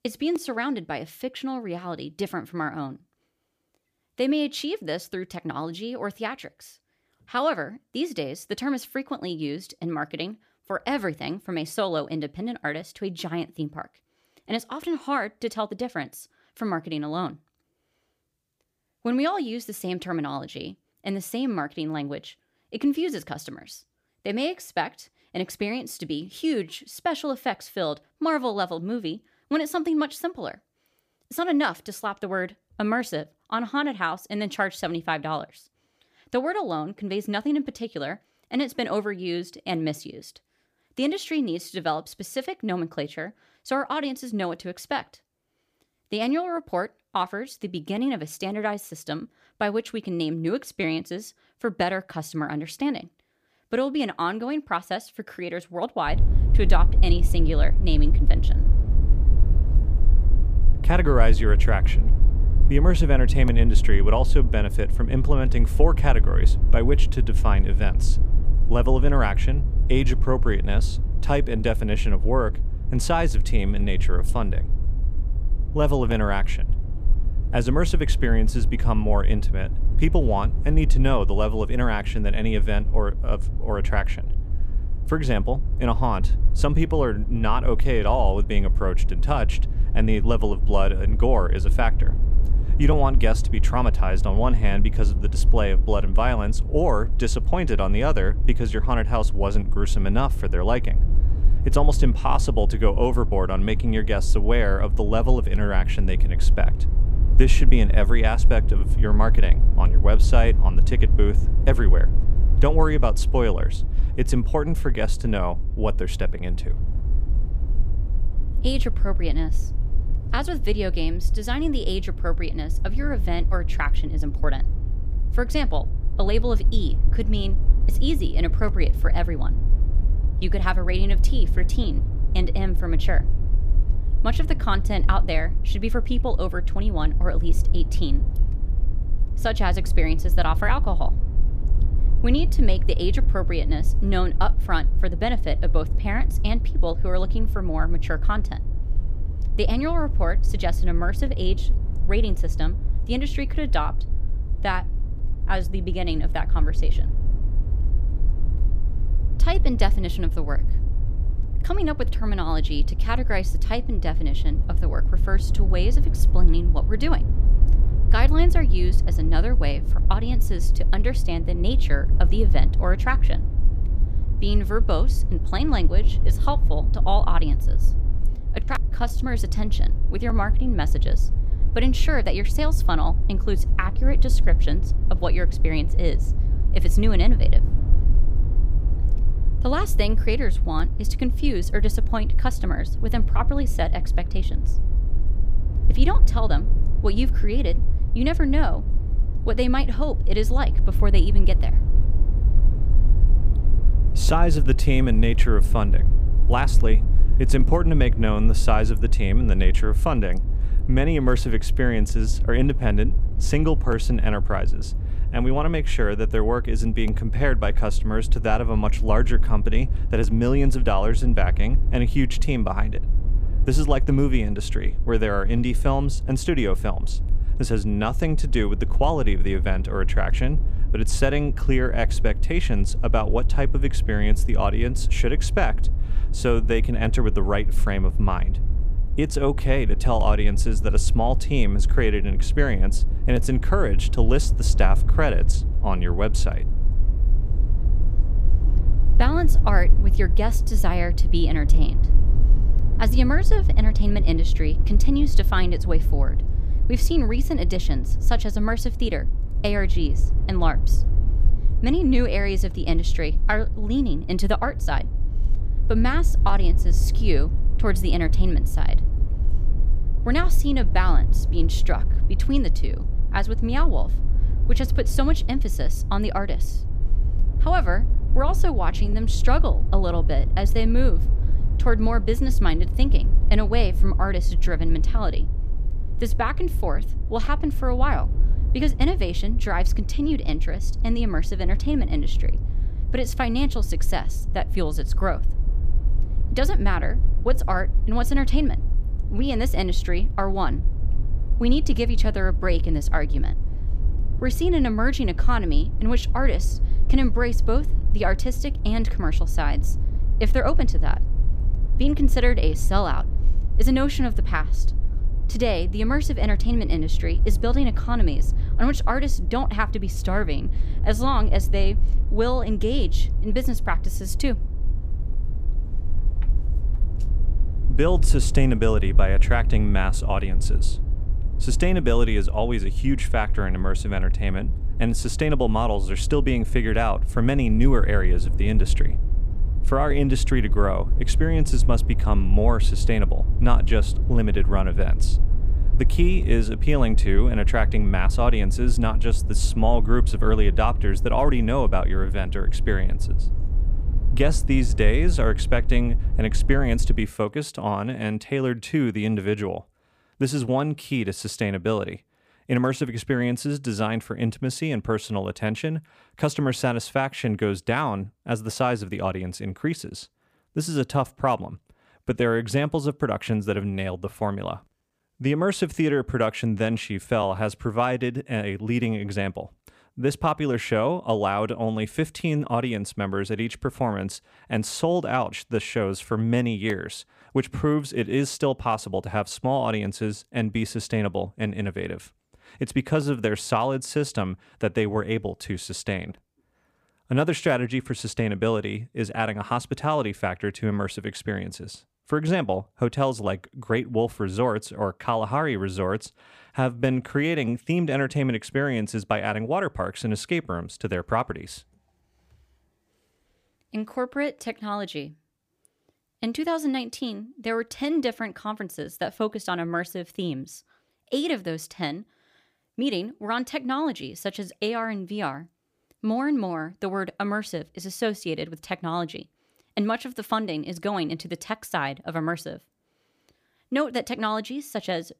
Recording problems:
low rumble; noticeable; from 56 s to 5:57; 15 dB below the speech

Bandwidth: 15 kHz